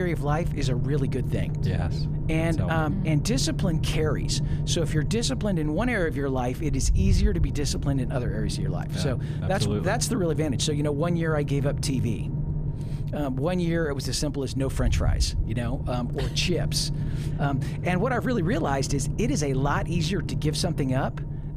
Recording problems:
low rumble; noticeable; throughout; 10 dB below the speech
abrupt cut into speech; at the start

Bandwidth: 14.5 kHz